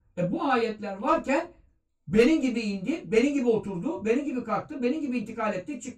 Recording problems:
off-mic speech; far
room echo; slight; dies away in 0.2 s

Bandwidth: 14.5 kHz